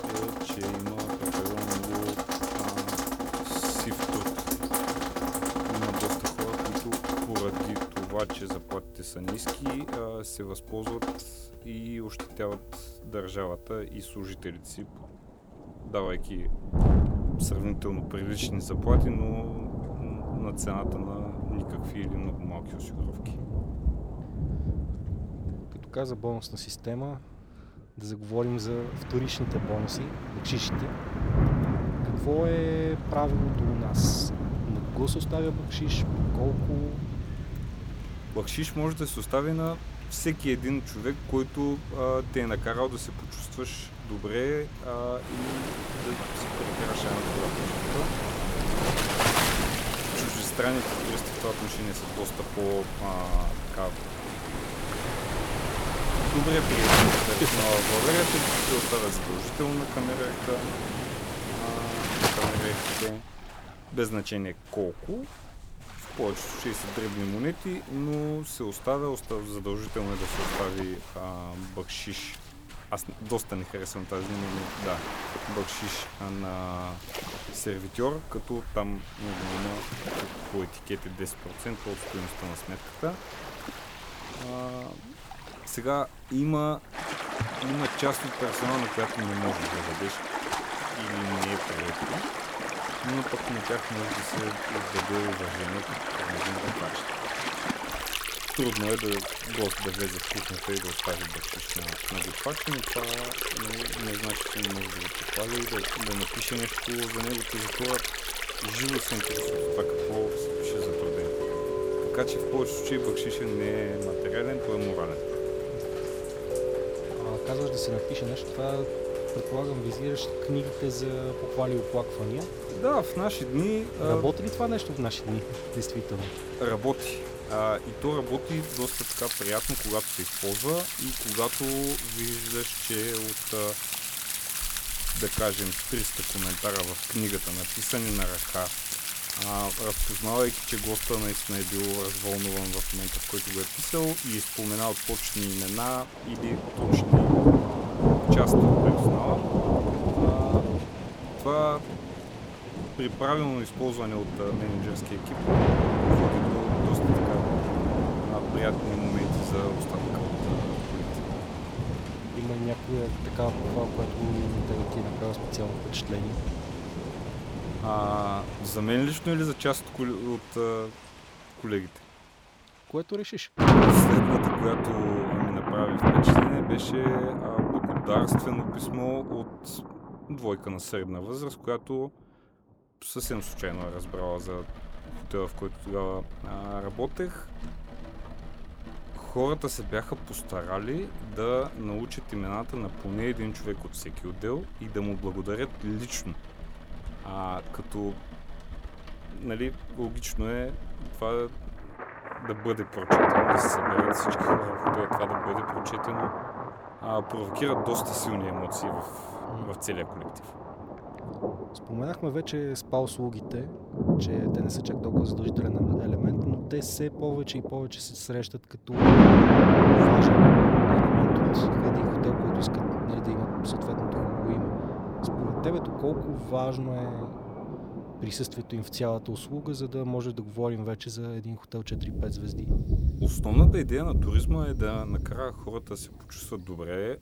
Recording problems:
rain or running water; very loud; throughout; 5 dB above the speech

